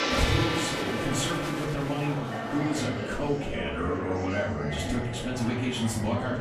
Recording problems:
off-mic speech; far
room echo; slight; dies away in 0.4 s
background music; loud; until 3 s; 2 dB below the speech
murmuring crowd; loud; throughout; 5 dB below the speech

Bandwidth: 14.5 kHz